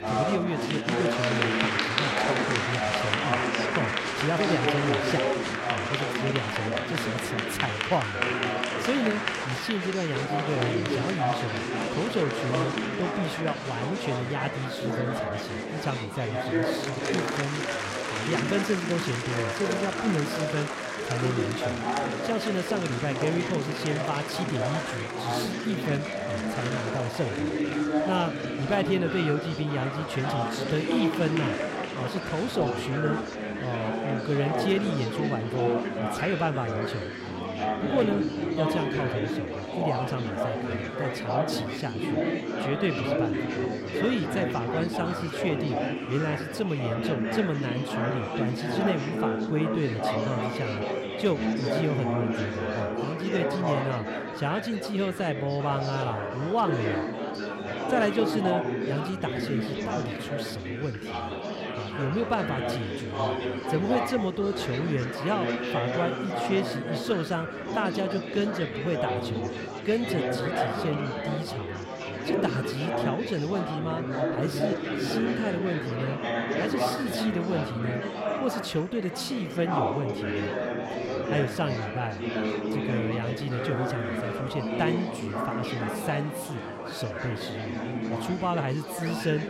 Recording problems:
murmuring crowd; very loud; throughout; 2 dB above the speech
animal sounds; faint; from 56 s on; 20 dB below the speech

